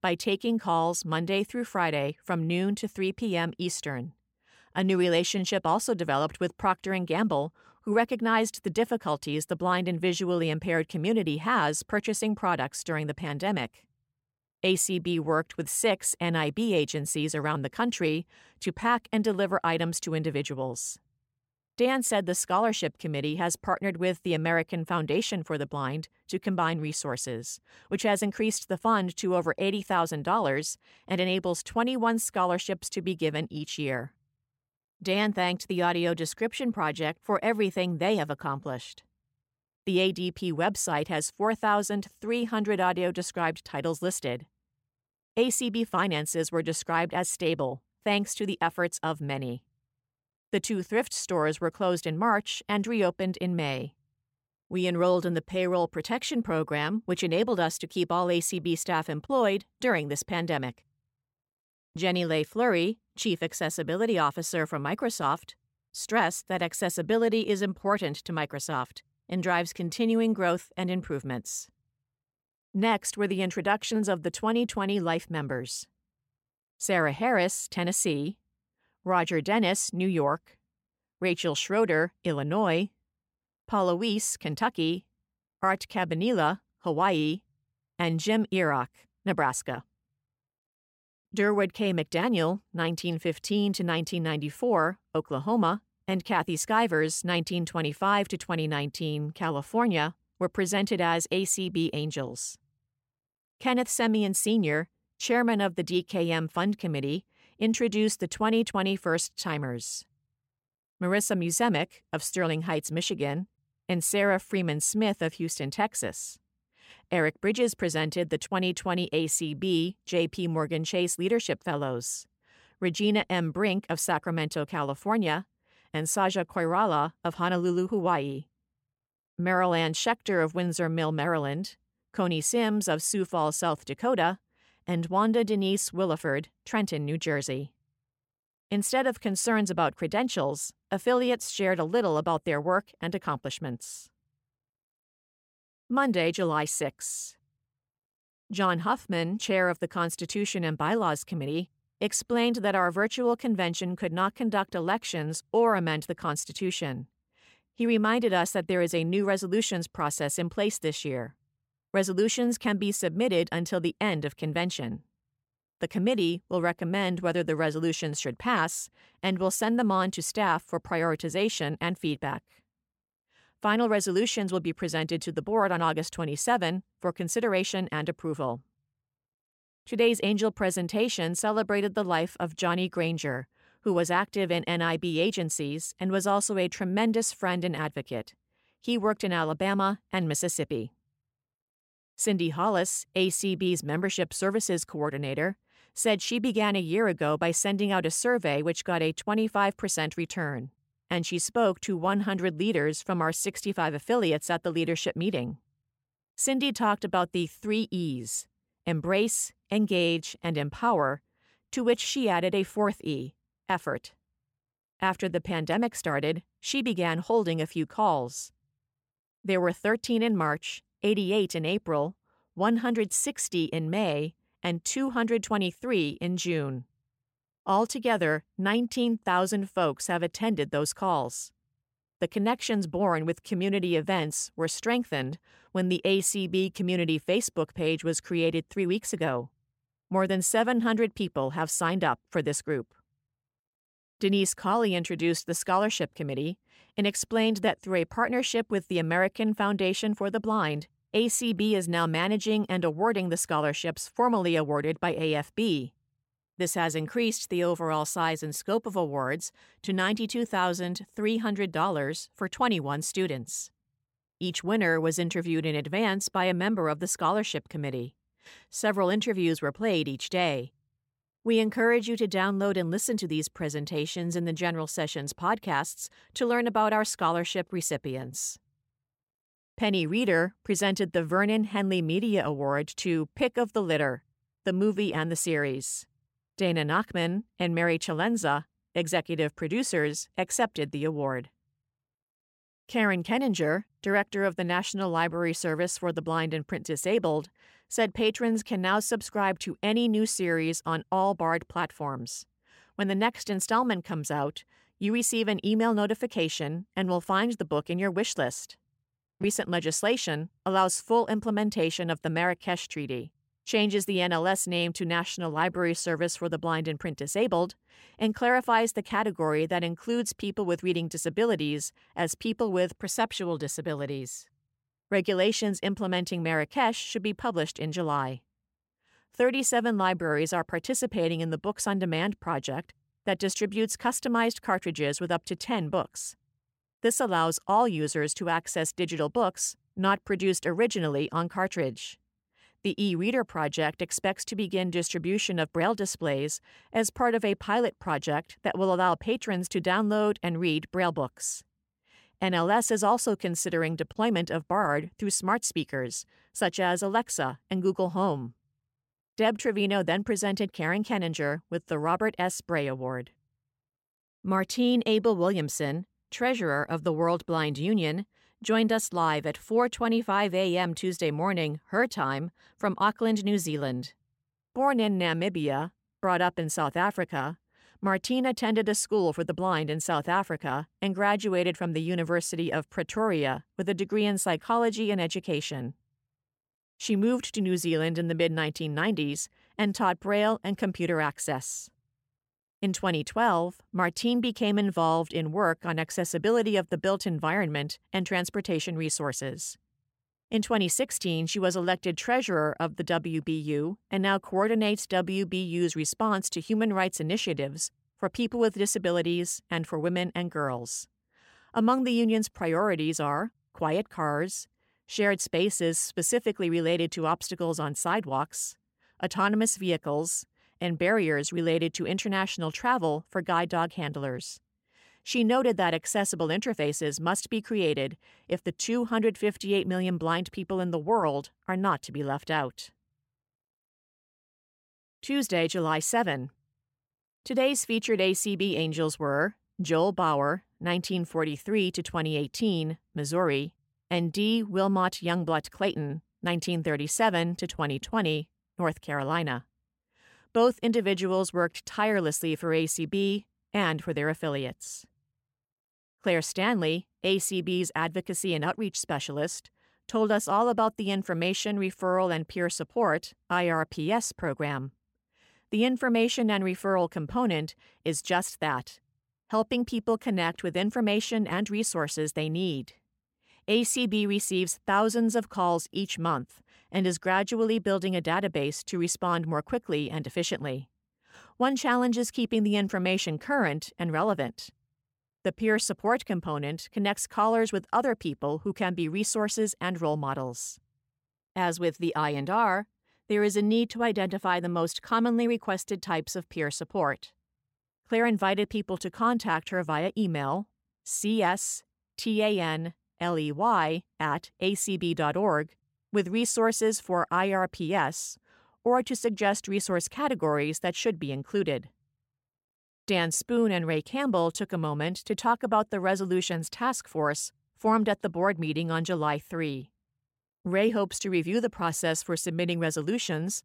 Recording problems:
none

